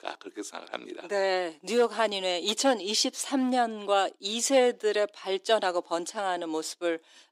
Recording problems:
thin; somewhat; fading below 300 Hz

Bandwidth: 15.5 kHz